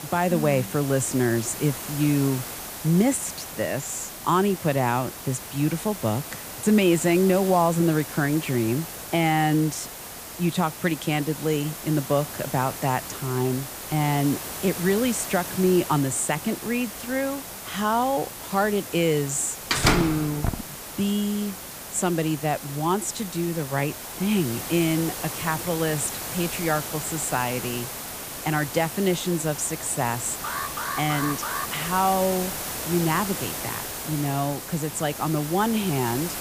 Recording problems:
hiss; loud; throughout; 8 dB below the speech
door banging; loud; at 20 s; peak 4 dB above the speech
alarm; noticeable; from 30 to 32 s; peak 5 dB below the speech

